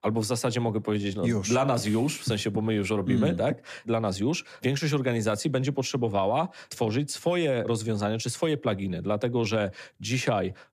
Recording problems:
none

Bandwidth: 14.5 kHz